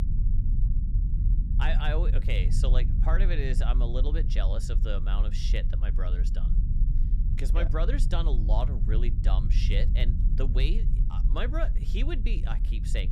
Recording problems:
low rumble; loud; throughout; 9 dB below the speech

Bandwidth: 15 kHz